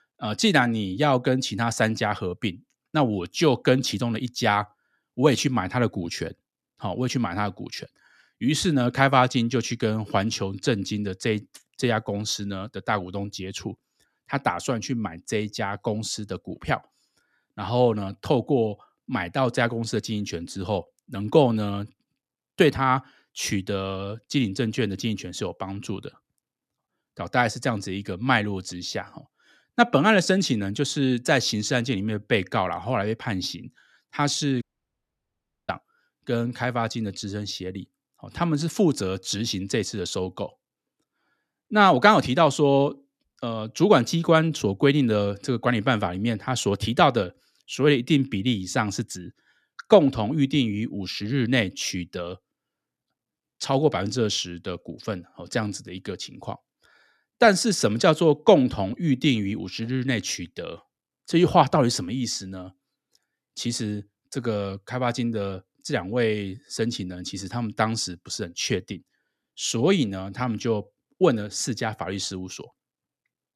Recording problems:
audio cutting out; at 35 s for 1 s

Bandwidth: 14 kHz